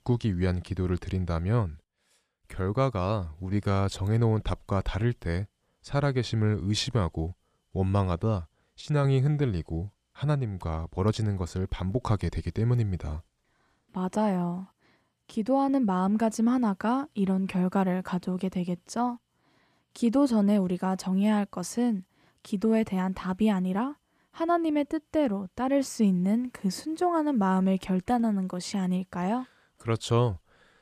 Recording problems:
none

